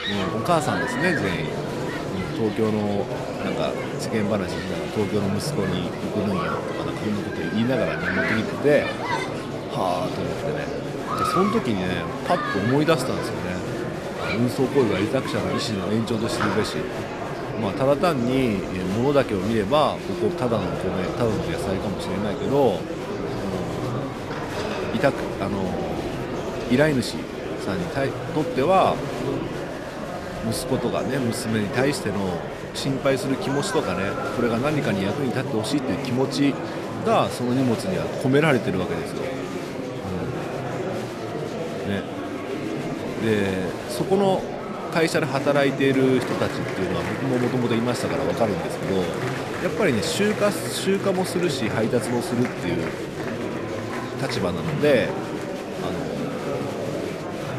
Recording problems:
murmuring crowd; loud; throughout; 3 dB below the speech

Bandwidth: 14 kHz